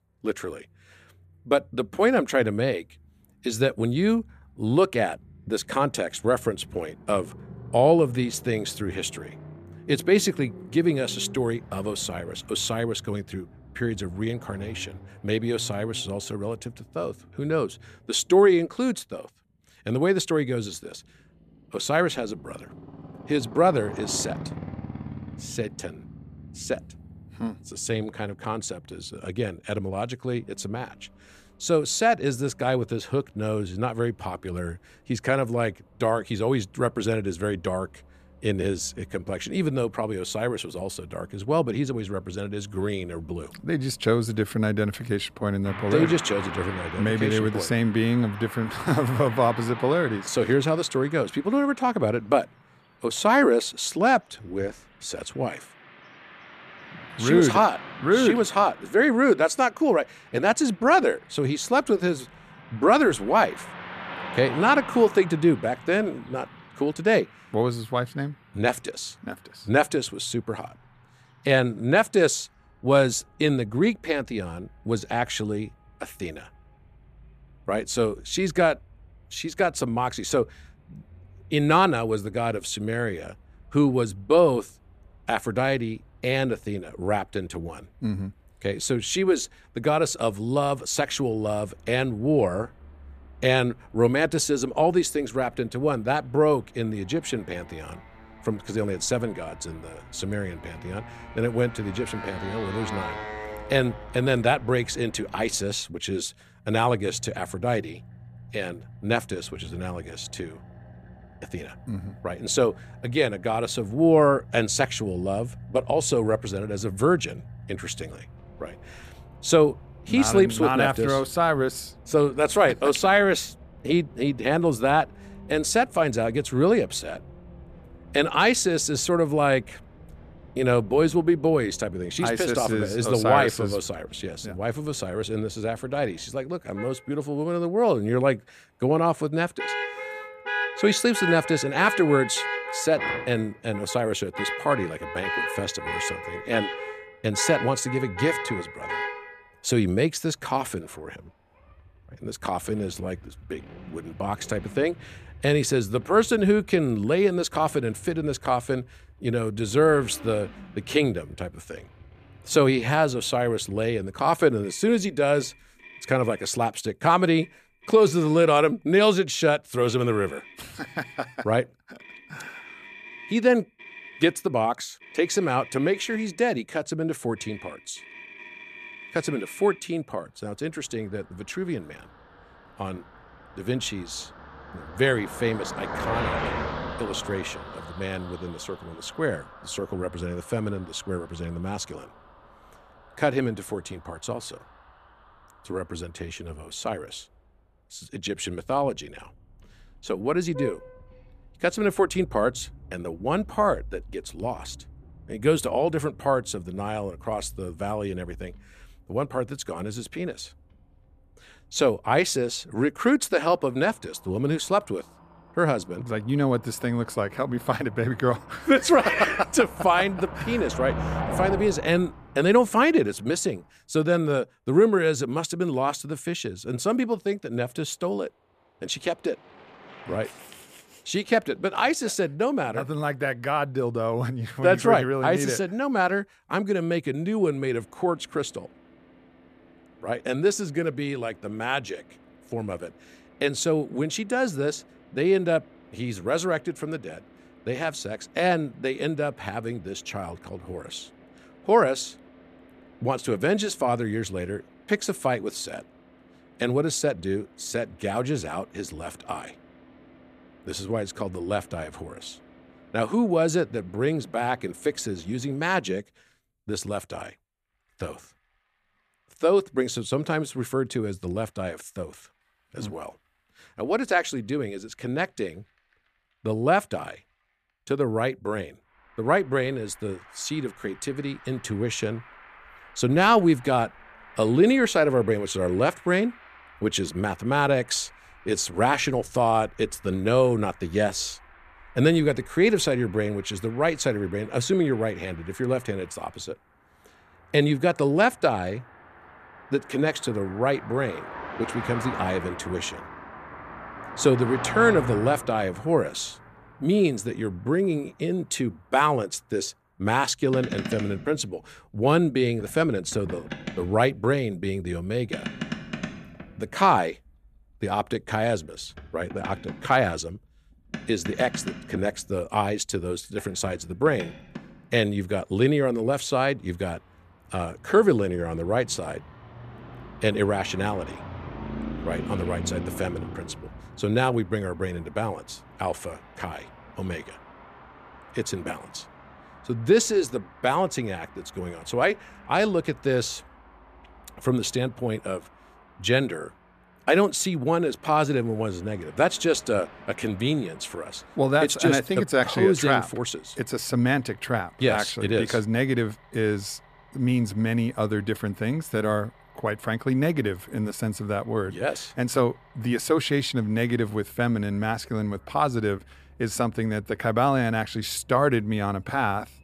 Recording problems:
traffic noise; noticeable; throughout; 15 dB below the speech

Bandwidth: 14.5 kHz